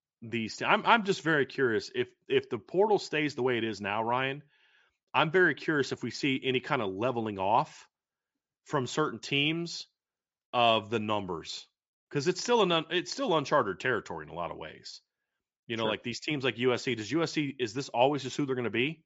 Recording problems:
high frequencies cut off; noticeable; nothing above 8 kHz

